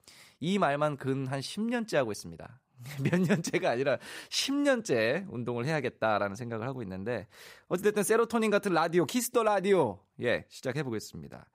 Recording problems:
none

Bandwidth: 15.5 kHz